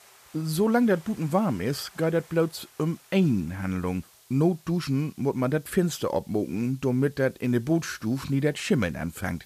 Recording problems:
rain or running water; faint; throughout; 30 dB below the speech
hiss; faint; throughout; 30 dB below the speech

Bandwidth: 14.5 kHz